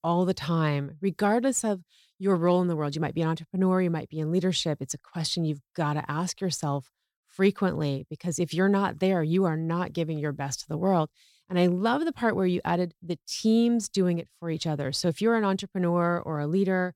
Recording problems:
none

